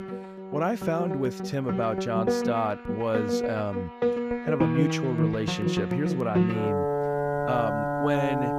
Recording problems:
background music; very loud; throughout; 1 dB above the speech

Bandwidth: 15 kHz